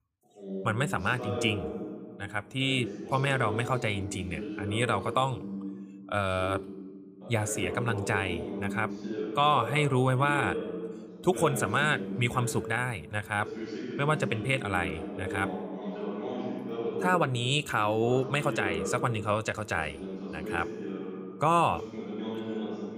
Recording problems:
voice in the background; loud; throughout; 8 dB below the speech

